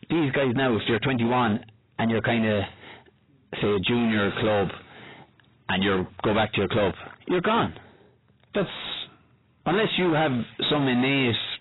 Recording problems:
distortion; heavy; 6 dB below the speech
garbled, watery; badly; nothing above 4 kHz

